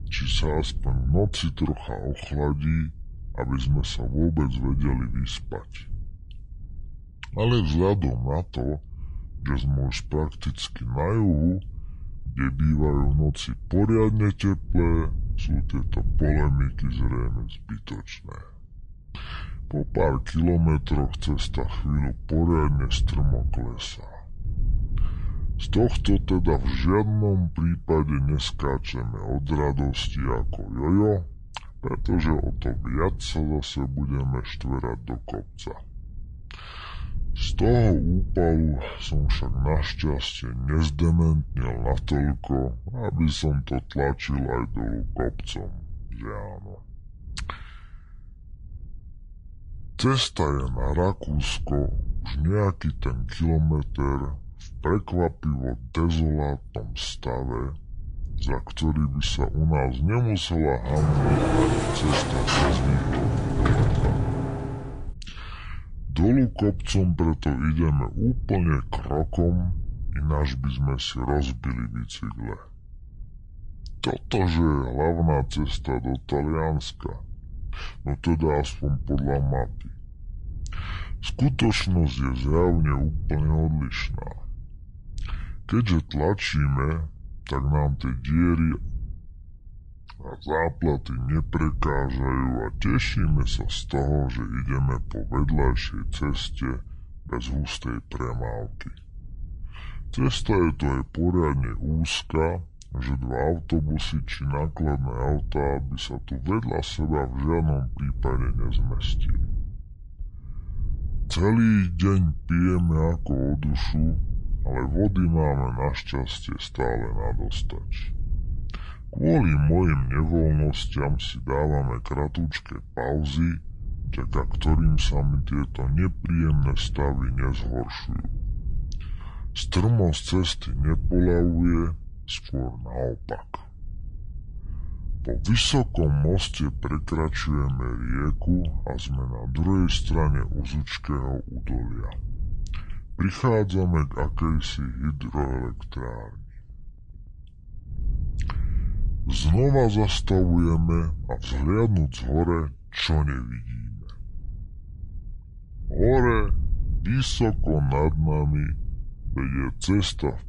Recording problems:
wrong speed and pitch; too slow and too low; 0.7 times normal speed
wind noise on the microphone; occasional gusts; 20 dB below the speech
door banging; loud; from 1:01 to 1:05; peak 4 dB above the speech

